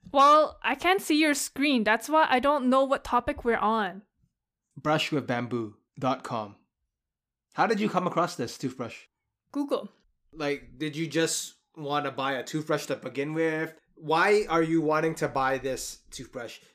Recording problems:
none

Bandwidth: 15 kHz